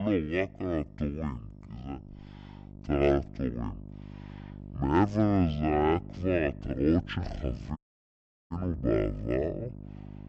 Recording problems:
wrong speed and pitch; too slow and too low; 0.5 times normal speed
electrical hum; faint; throughout; 50 Hz, 20 dB below the speech
abrupt cut into speech; at the start
audio cutting out; at 8 s for 0.5 s

